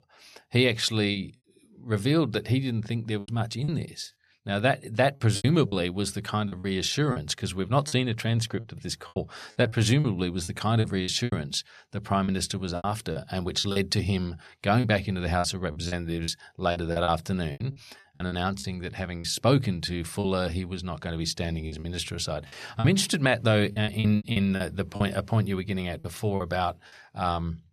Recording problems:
choppy; very; 9% of the speech affected

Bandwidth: 13.5 kHz